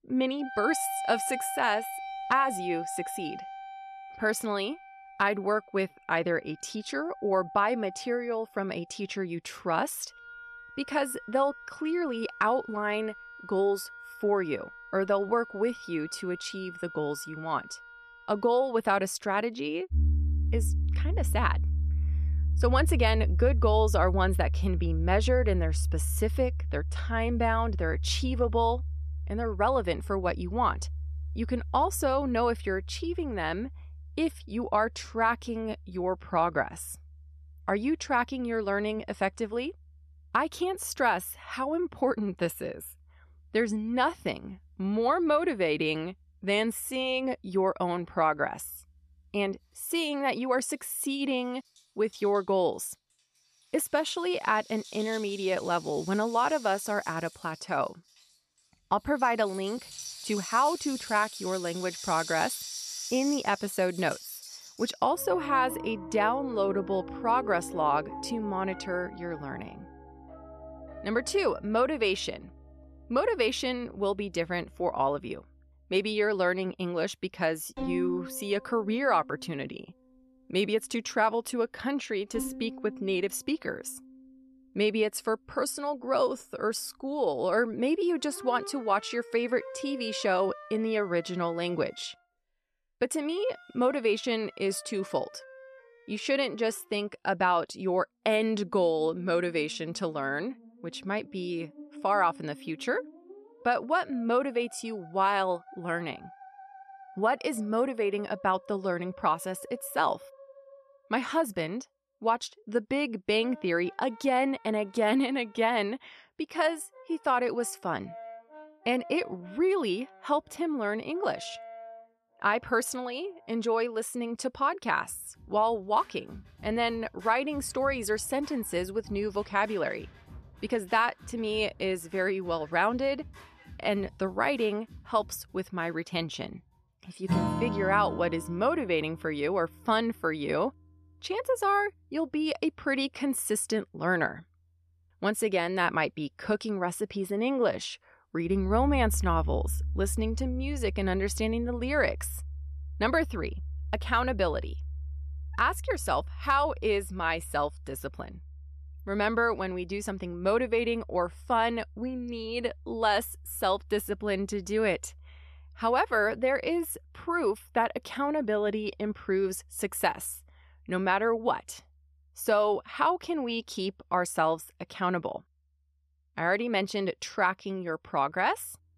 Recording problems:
background music; loud; throughout; 7 dB below the speech

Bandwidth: 13.5 kHz